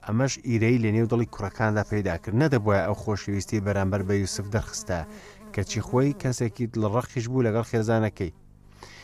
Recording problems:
electrical hum; faint; throughout; 50 Hz, 25 dB below the speech

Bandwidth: 15 kHz